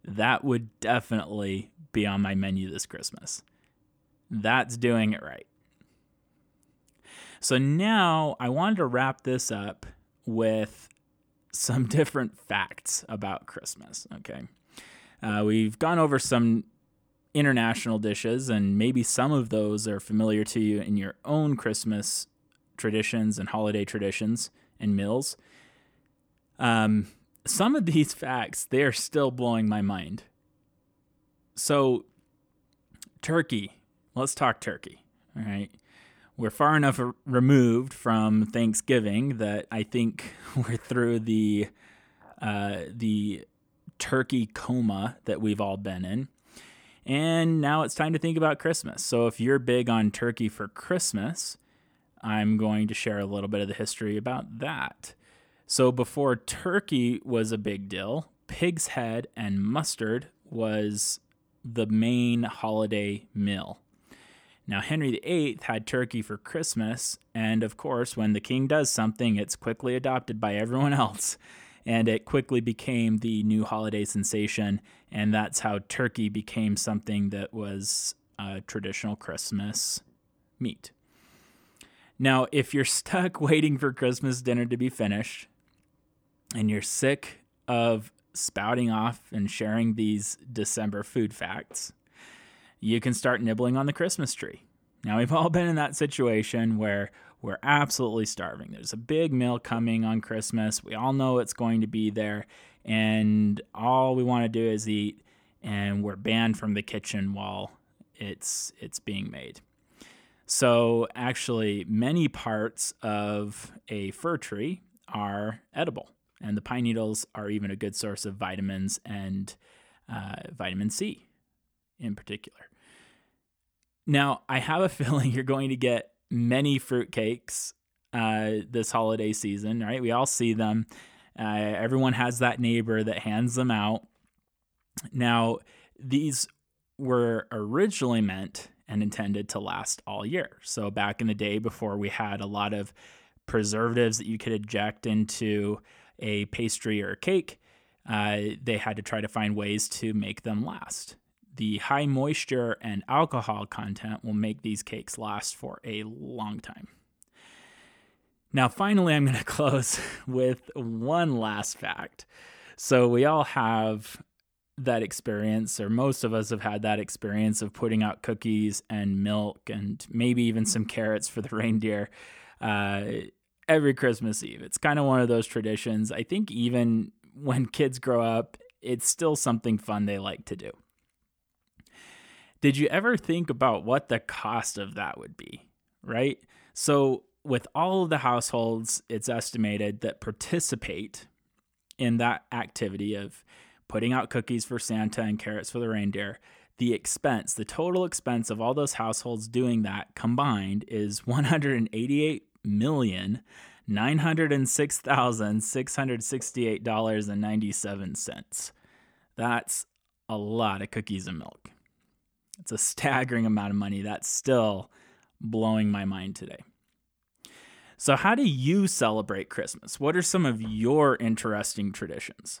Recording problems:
none

